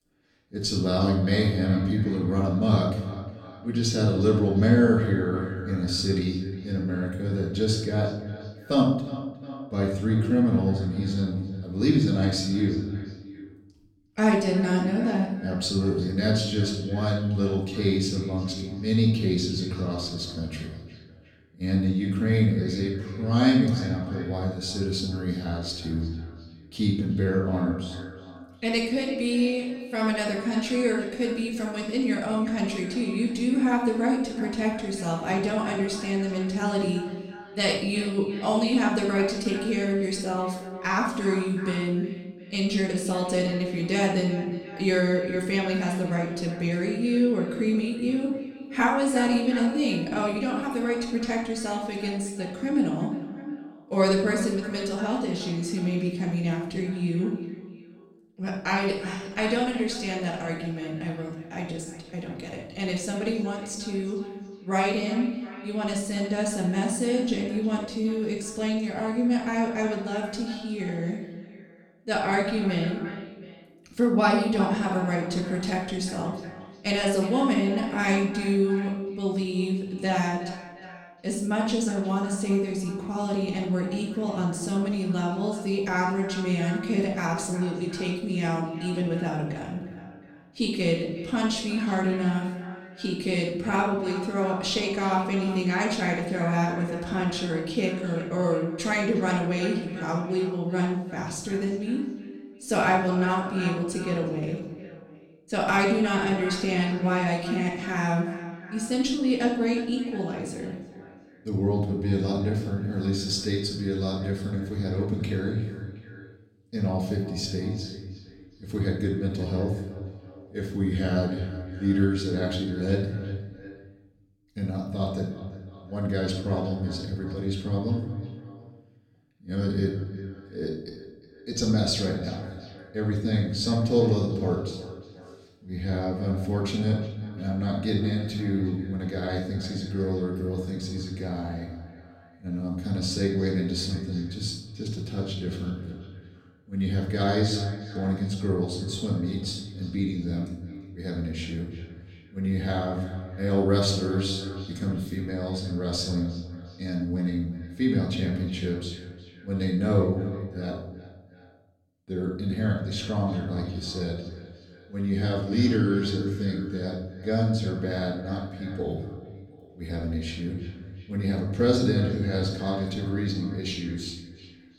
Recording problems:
off-mic speech; far
echo of what is said; noticeable; throughout; 360 ms later, 15 dB below the speech
room echo; noticeable; dies away in 0.8 s

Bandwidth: 18 kHz